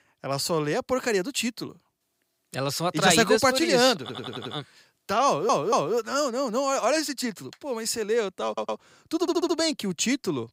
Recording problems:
audio stuttering; 4 times, first at 4 s

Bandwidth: 15.5 kHz